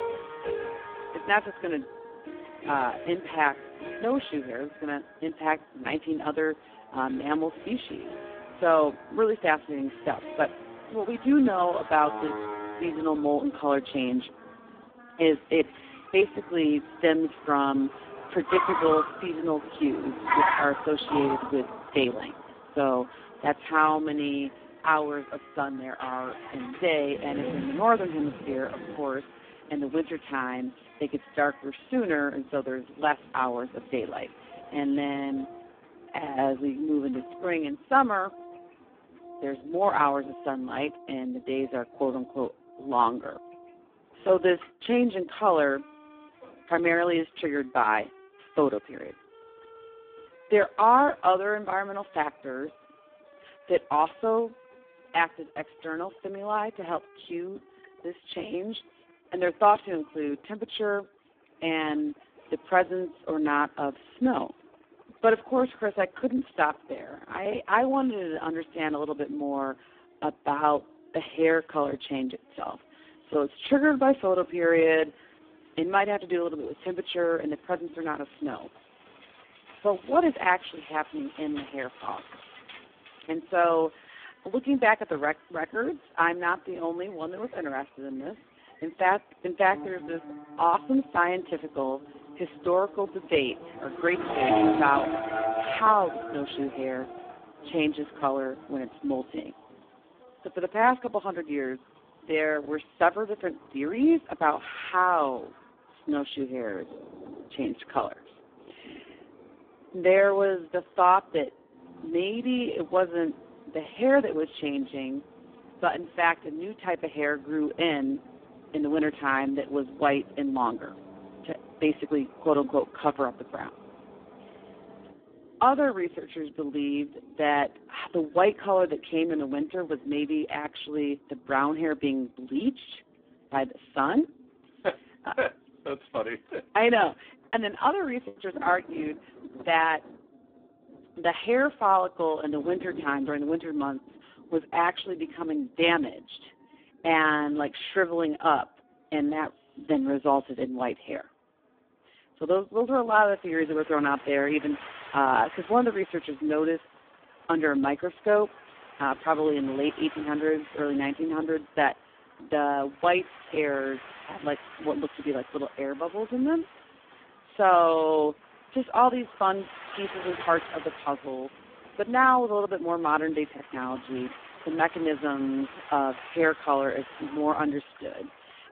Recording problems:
phone-call audio; poor line
traffic noise; loud; throughout; 10 dB below the speech
background music; faint; throughout; 20 dB below the speech
rain or running water; faint; throughout; 20 dB below the speech
choppy; occasionally; at 2:18; 3% of the speech affected

